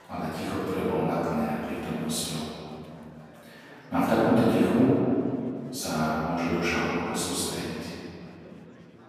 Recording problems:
room echo; strong; dies away in 2.4 s
off-mic speech; far
chatter from many people; faint; throughout; 25 dB below the speech

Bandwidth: 15 kHz